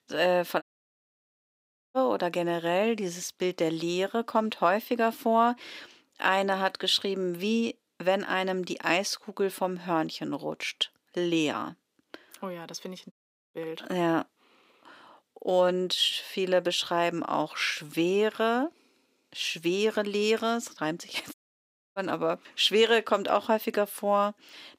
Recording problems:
thin; somewhat; fading below 350 Hz
audio cutting out; at 0.5 s for 1.5 s, at 13 s and at 21 s for 0.5 s

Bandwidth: 15.5 kHz